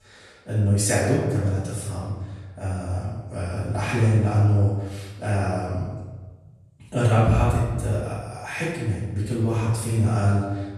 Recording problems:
room echo; strong; dies away in 1.1 s
off-mic speech; far

